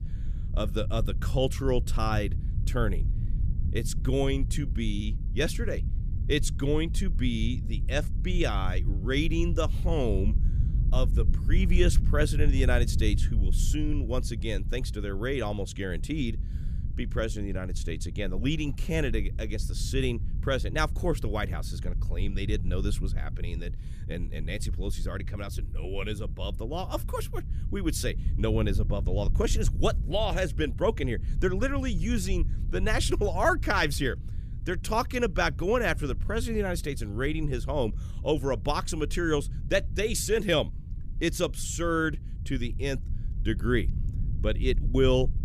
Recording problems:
low rumble; noticeable; throughout; 15 dB below the speech

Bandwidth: 15 kHz